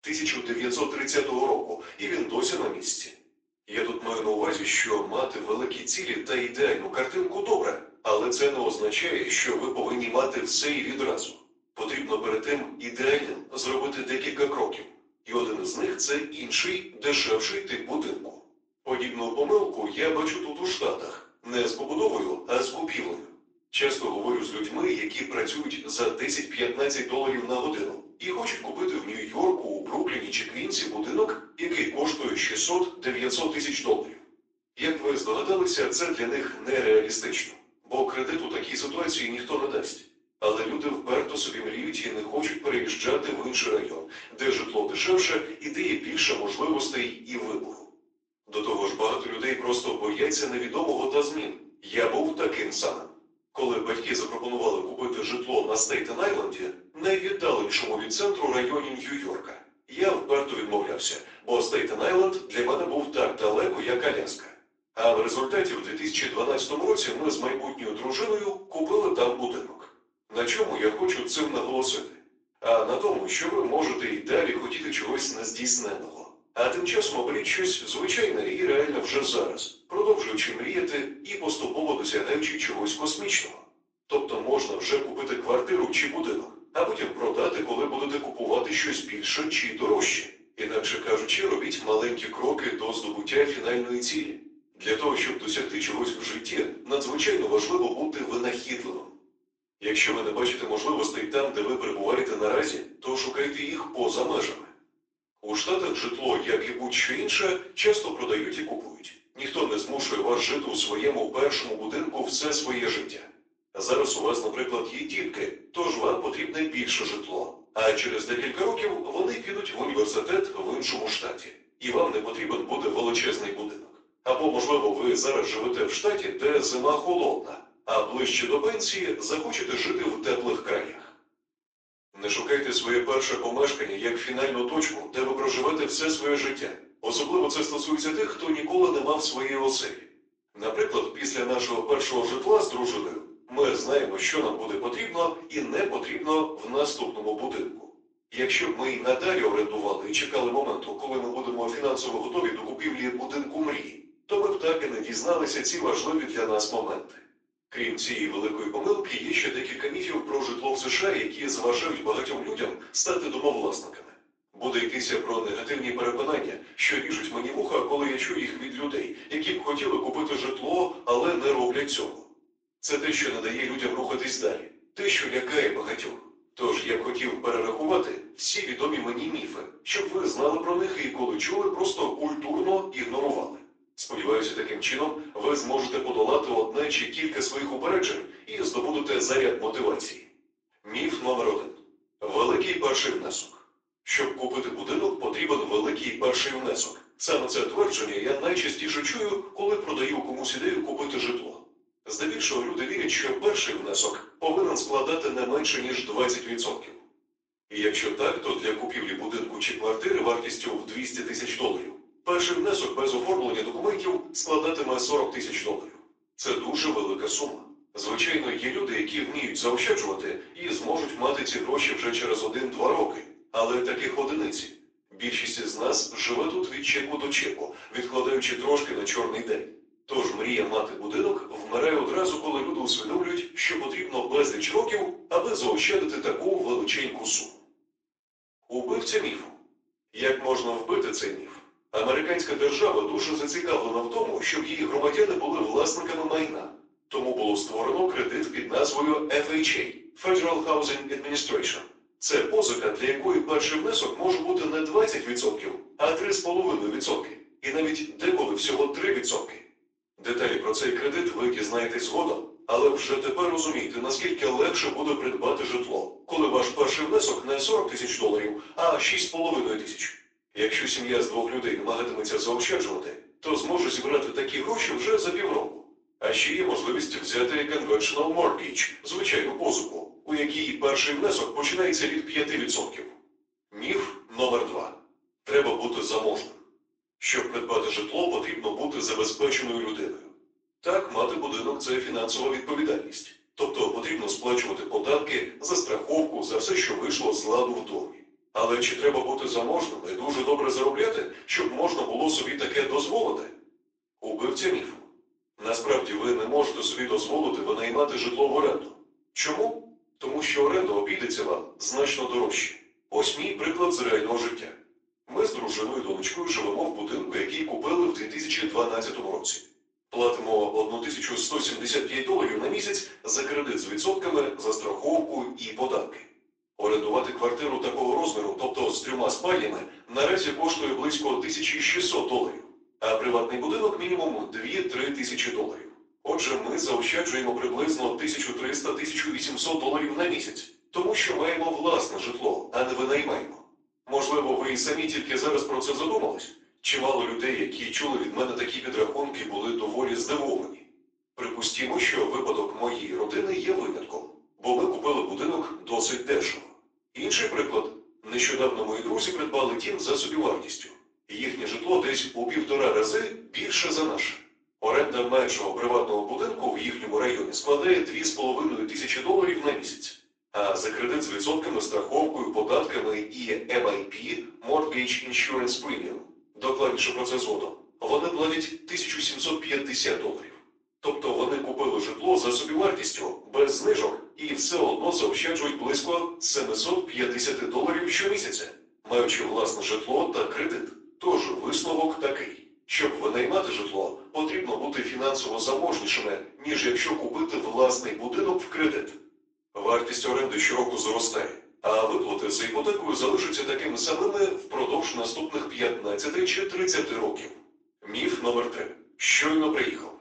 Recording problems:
off-mic speech; far
thin; very; fading below 350 Hz
room echo; slight; dies away in 0.5 s
garbled, watery; slightly; nothing above 7.5 kHz

